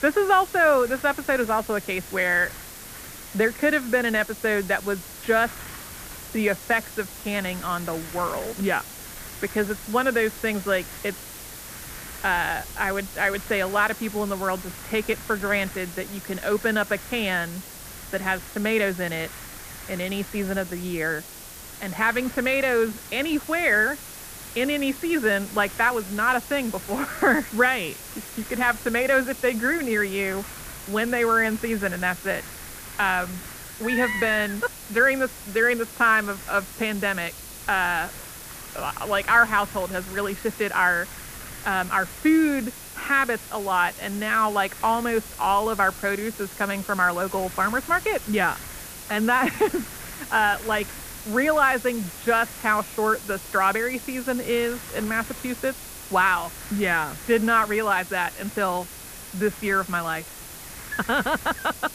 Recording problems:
muffled; very; fading above 2.5 kHz
wind noise on the microphone; occasional gusts; 20 dB below the speech
hiss; noticeable; throughout; 15 dB below the speech
high-pitched whine; faint; from 23 s on; 10 kHz, 25 dB below the speech

